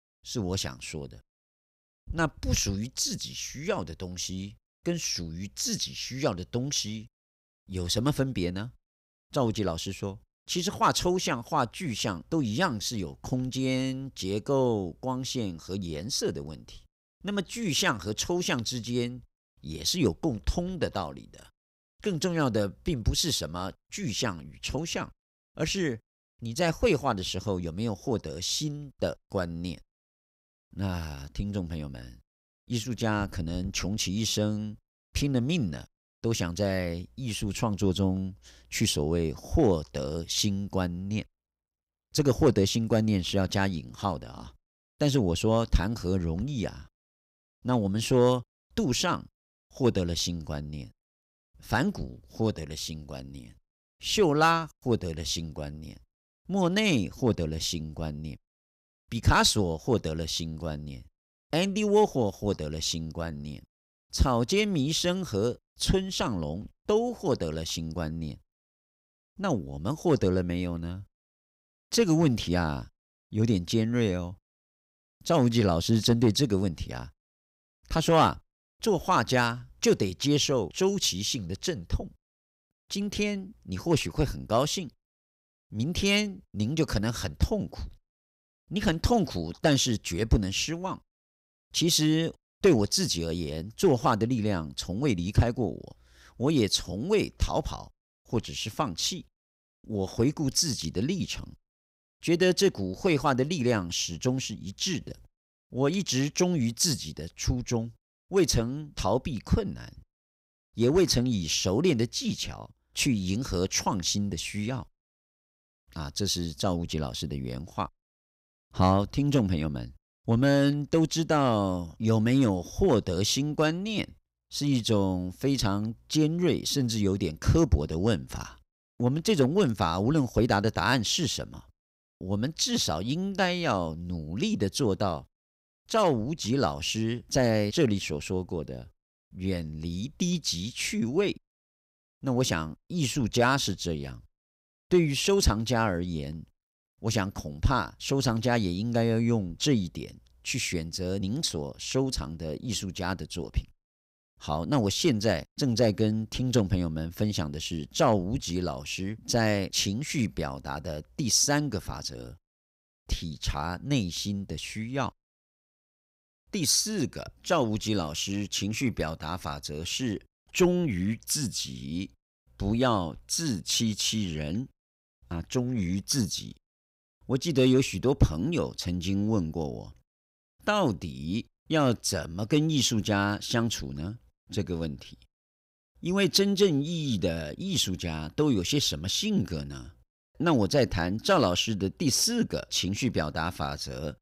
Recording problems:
none

